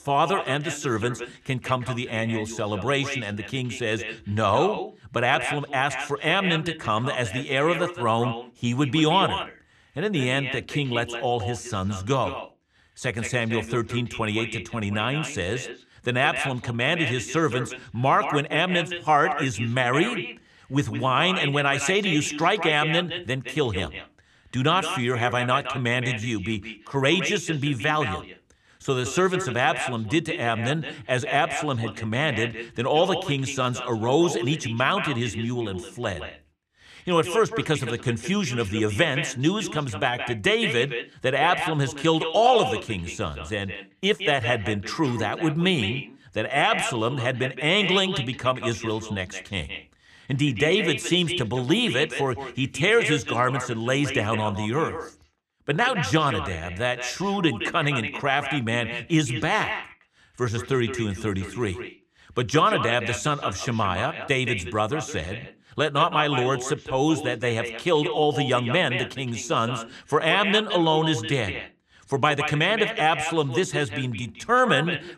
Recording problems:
echo of what is said; strong; throughout; 170 ms later, 8 dB below the speech

